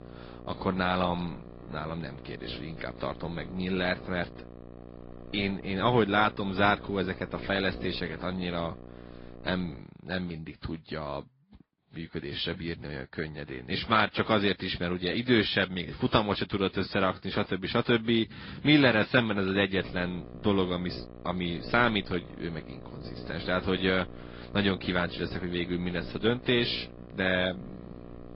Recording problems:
high frequencies cut off; noticeable; nothing above 5 kHz
garbled, watery; slightly
electrical hum; faint; until 10 s and from 20 s on; 60 Hz, 20 dB below the speech

